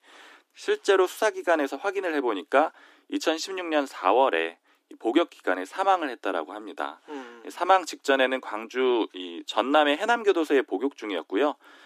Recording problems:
thin; somewhat; fading below 300 Hz

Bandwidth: 14.5 kHz